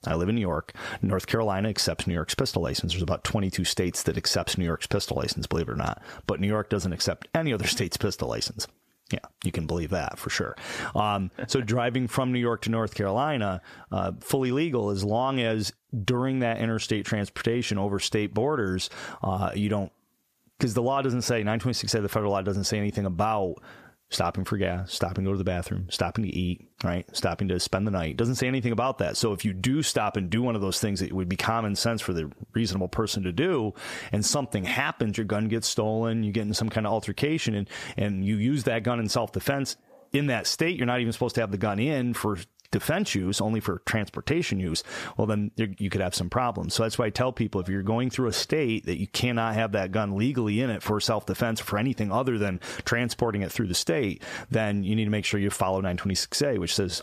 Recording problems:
squashed, flat; somewhat

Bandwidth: 14.5 kHz